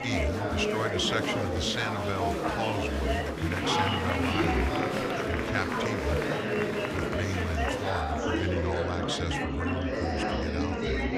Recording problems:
murmuring crowd; very loud; throughout; 3 dB above the speech

